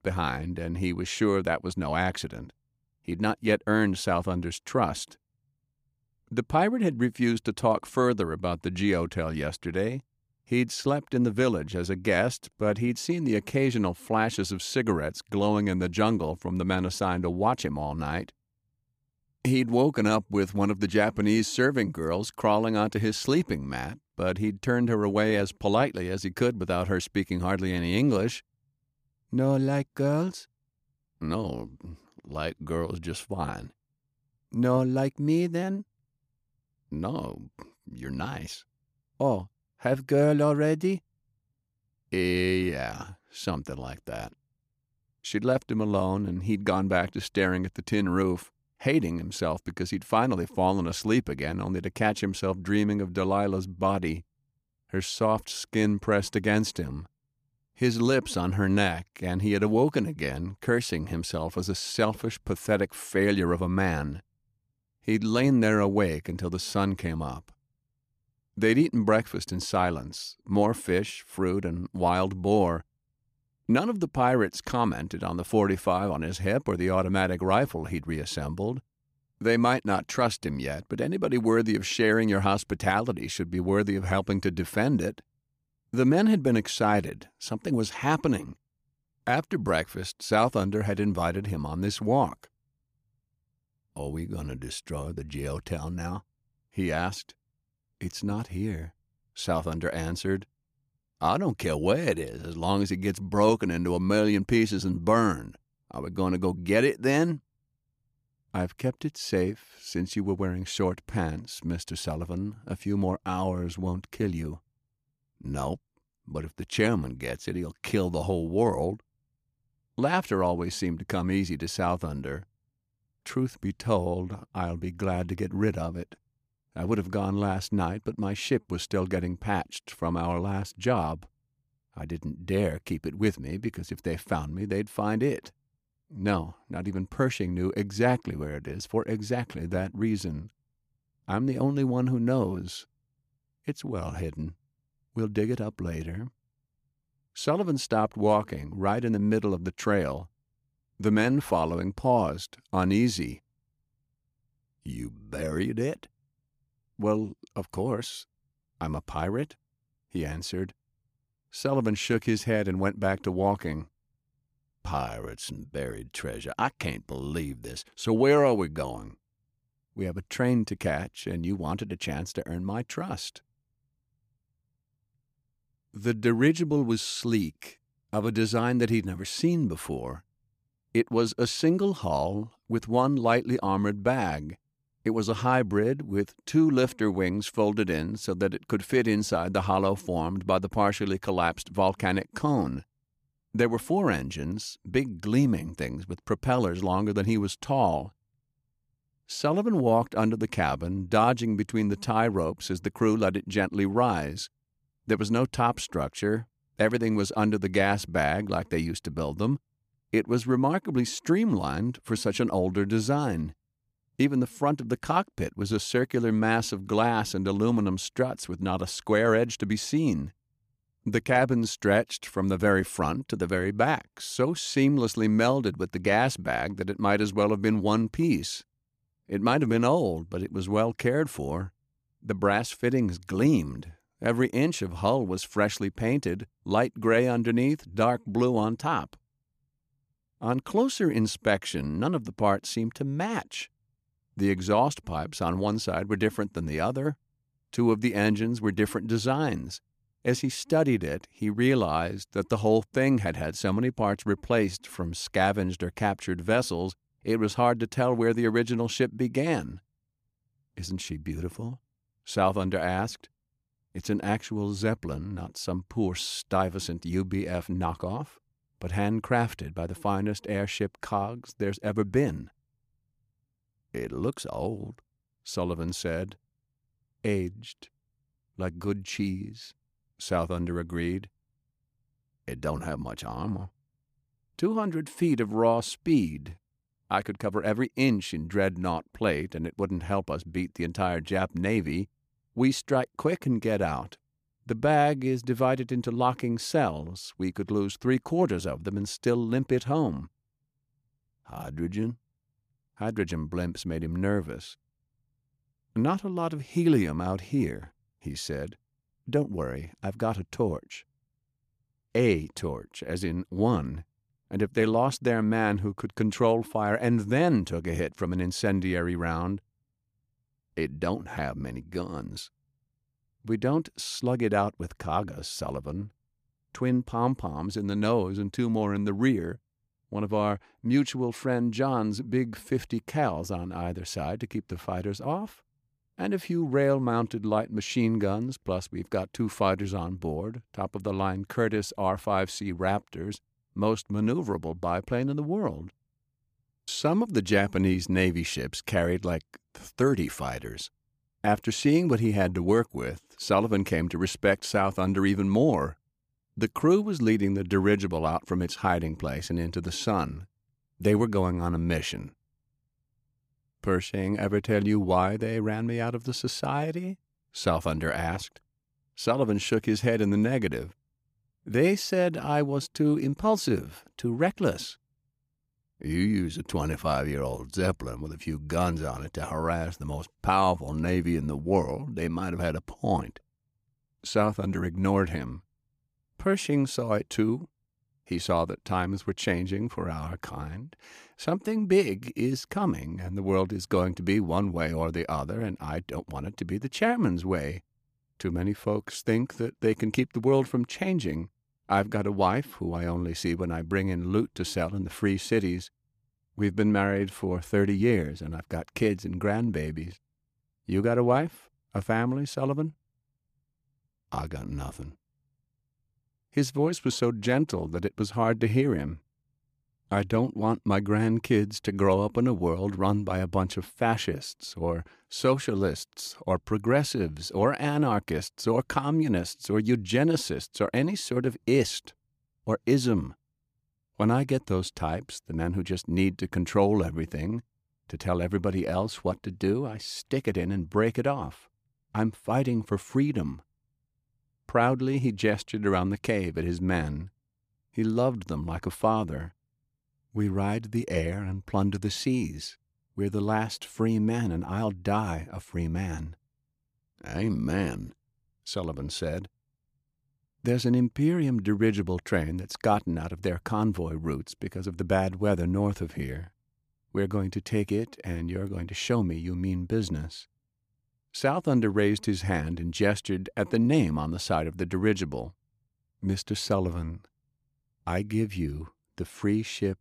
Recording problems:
none

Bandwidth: 15 kHz